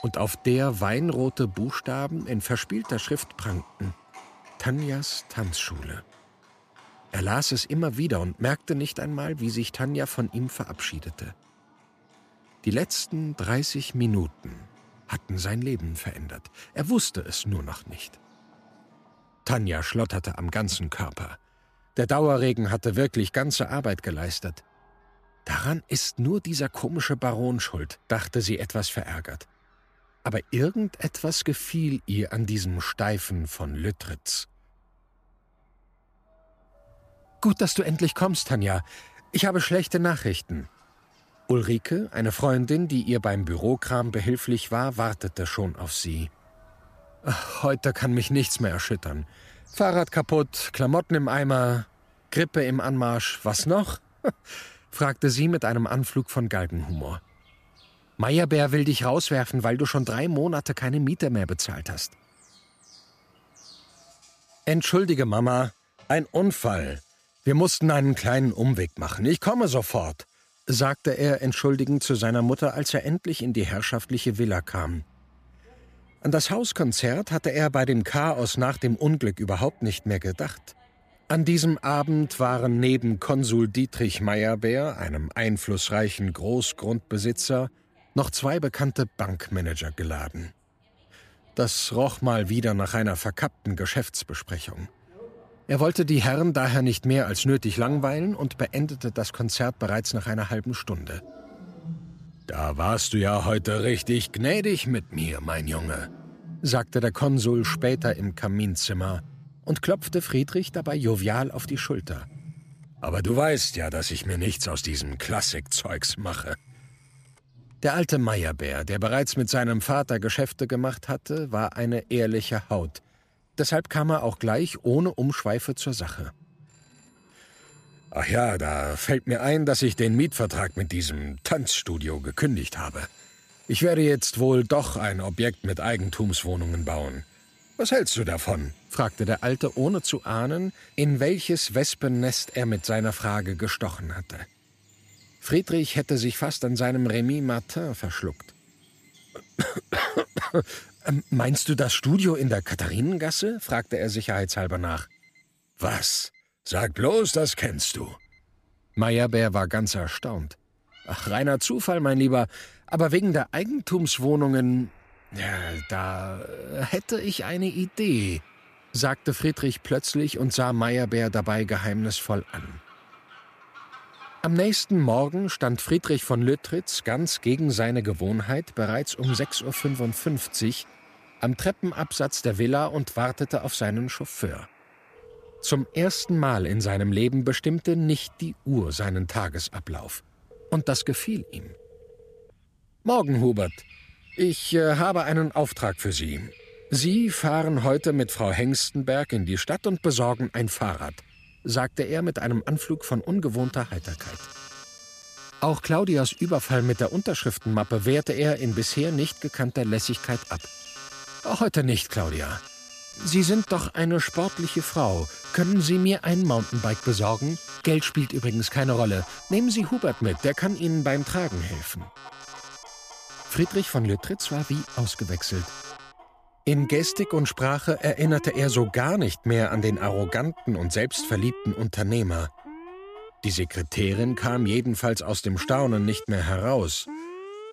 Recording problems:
alarms or sirens; noticeable; throughout; 20 dB below the speech
animal sounds; faint; throughout; 25 dB below the speech

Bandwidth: 14.5 kHz